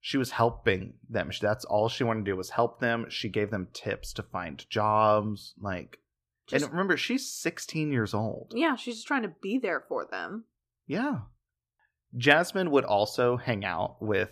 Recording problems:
none

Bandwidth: 14.5 kHz